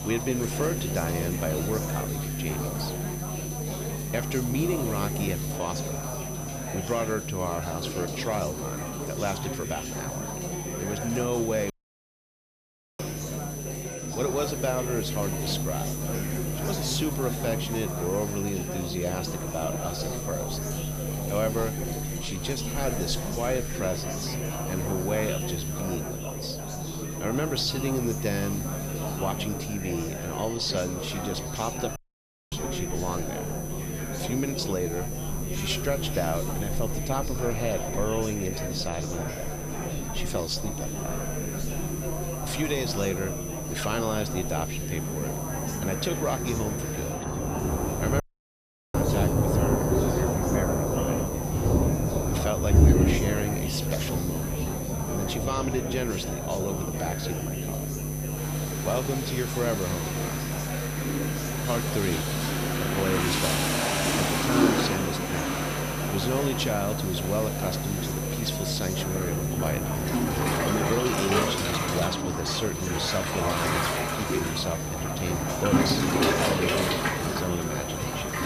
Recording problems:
rain or running water; very loud; throughout; 3 dB above the speech
electrical hum; loud; throughout; 60 Hz, 10 dB below the speech
high-pitched whine; loud; throughout; 6 kHz, 8 dB below the speech
chatter from many people; loud; throughout; 5 dB below the speech
audio cutting out; at 12 s for 1.5 s, at 32 s for 0.5 s and at 48 s for 0.5 s

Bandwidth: 15 kHz